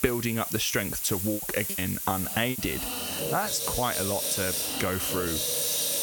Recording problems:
squashed, flat; somewhat
household noises; very loud; throughout; as loud as the speech
hiss; loud; throughout; 2 dB below the speech
choppy; very; from 1.5 to 2.5 s; 13% of the speech affected

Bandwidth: 18 kHz